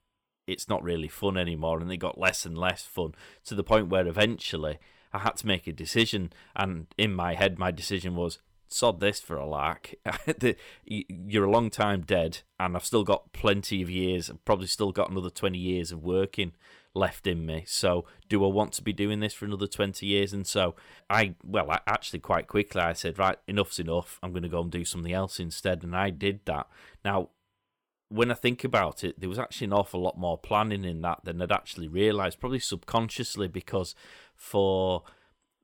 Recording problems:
none

